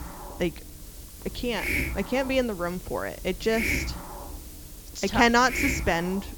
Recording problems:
high frequencies cut off; noticeable; nothing above 8 kHz
hiss; loud; throughout; 6 dB below the speech

